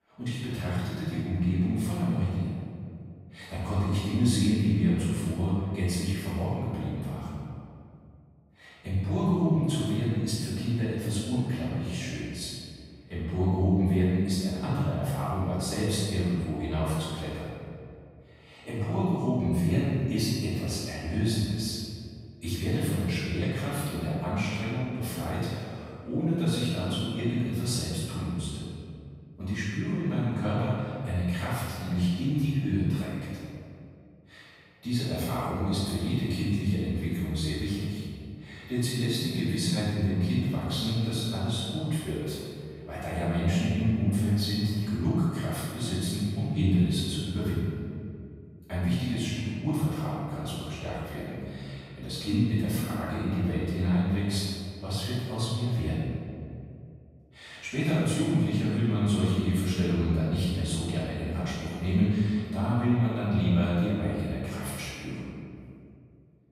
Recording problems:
room echo; strong; dies away in 2.1 s
off-mic speech; far

